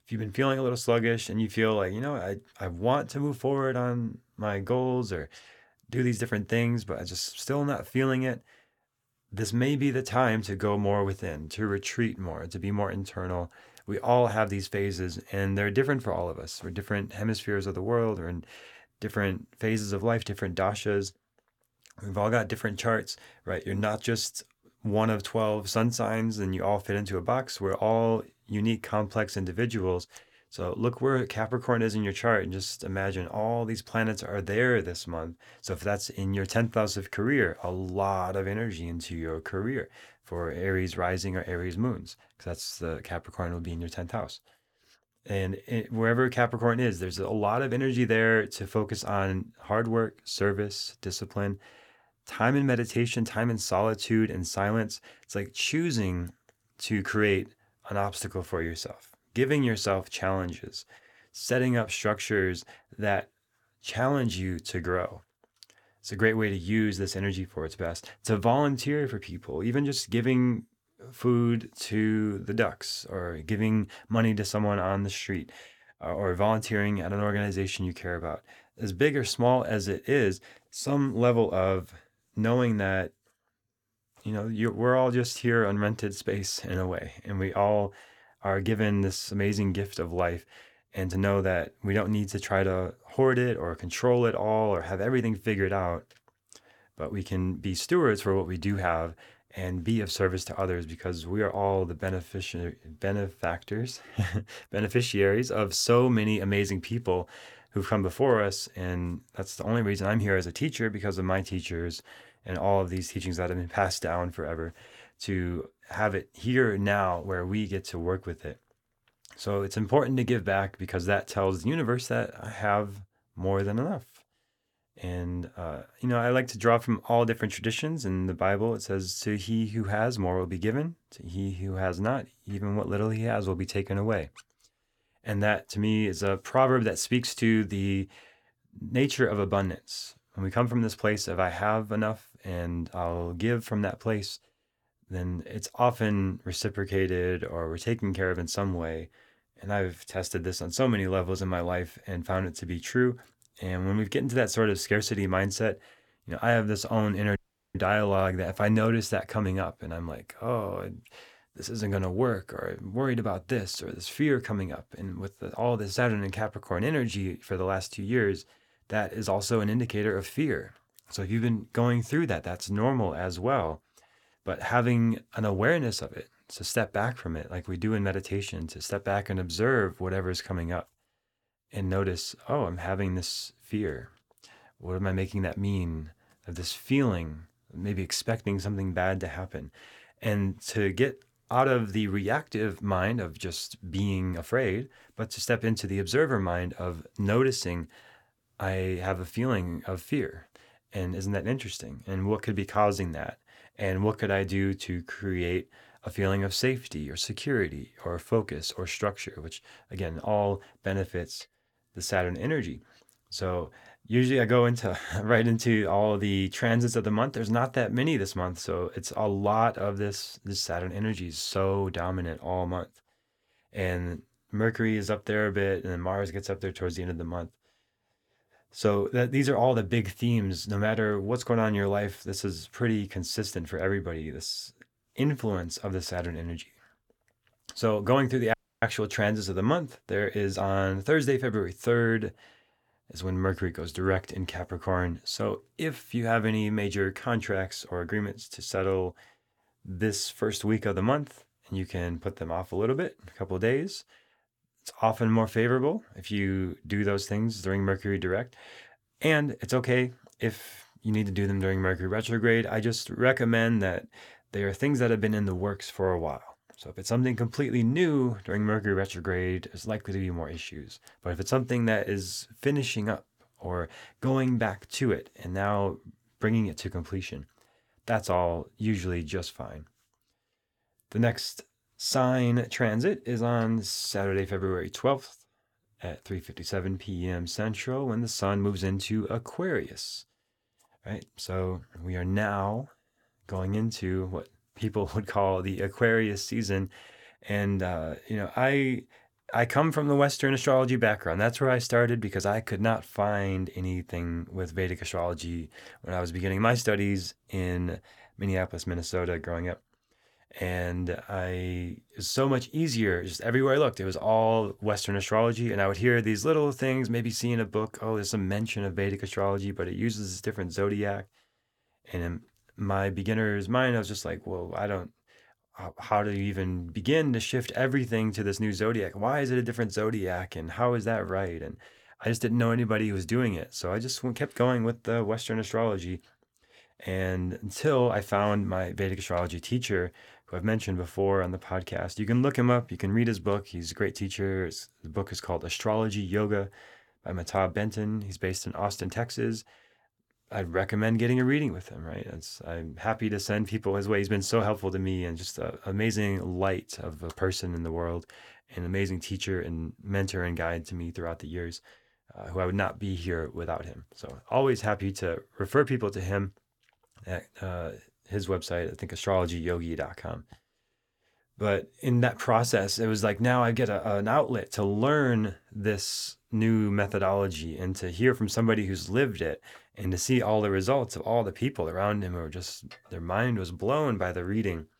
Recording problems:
audio cutting out; at 2:37 and at 3:59

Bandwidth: 18.5 kHz